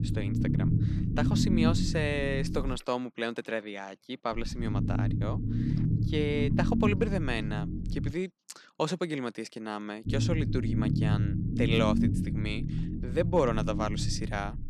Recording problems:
low rumble; loud; until 3 s, from 4.5 to 8 s and from 10 s on; 5 dB below the speech

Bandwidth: 13.5 kHz